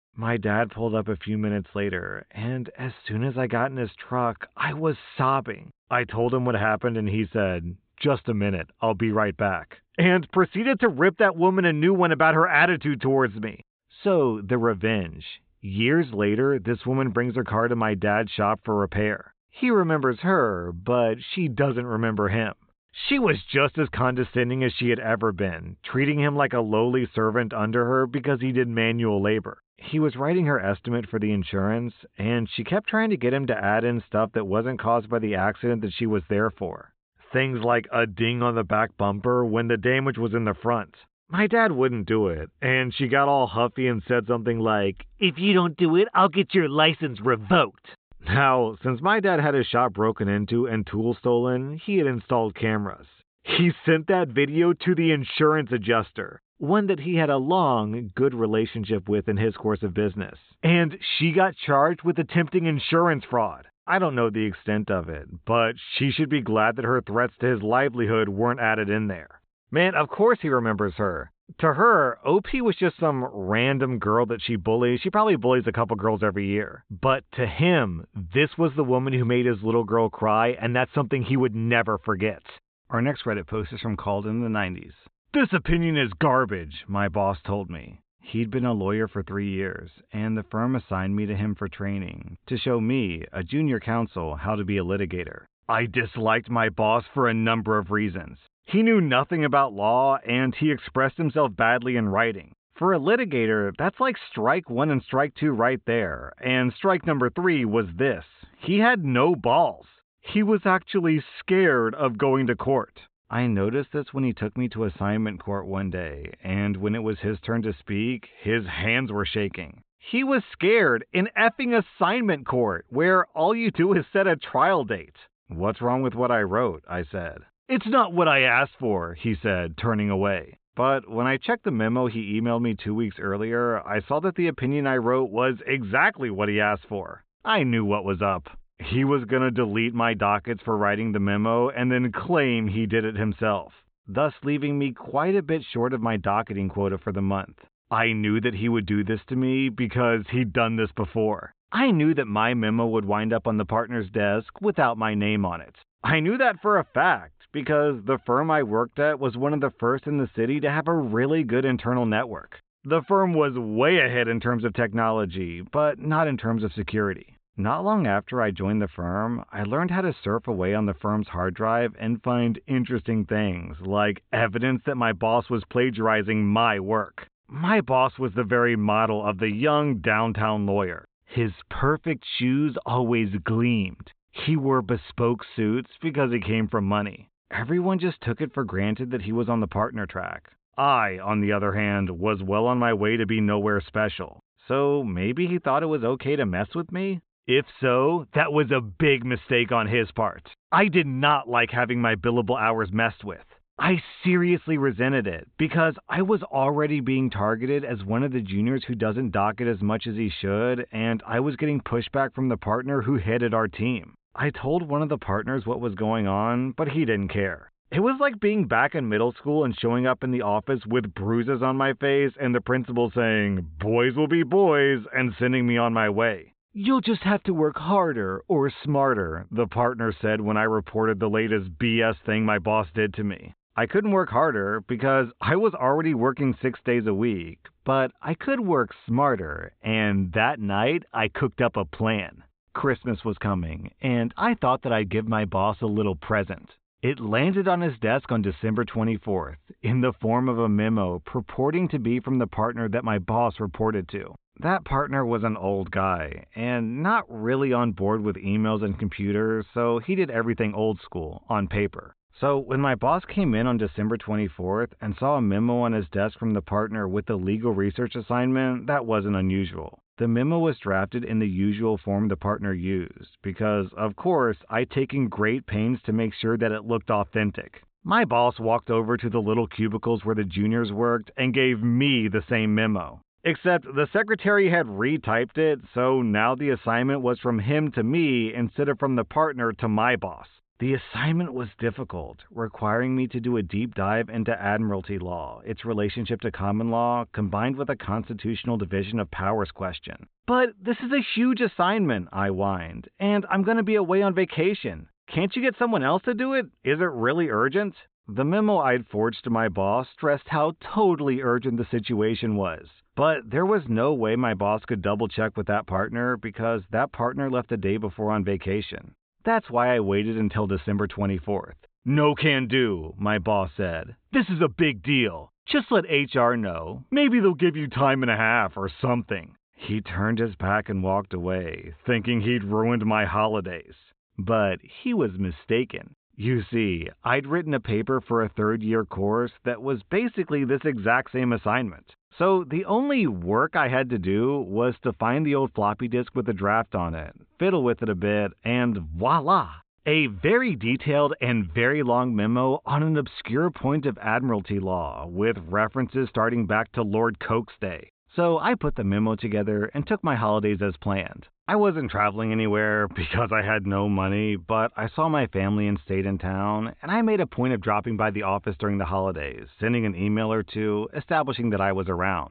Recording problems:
high frequencies cut off; severe; nothing above 4 kHz

